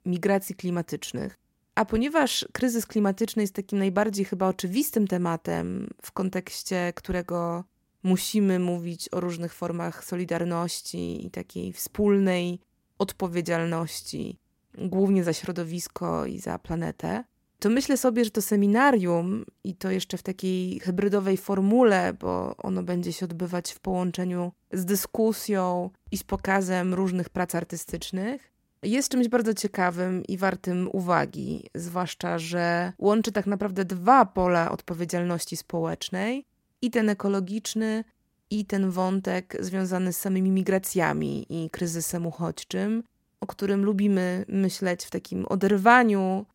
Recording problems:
none

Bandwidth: 16 kHz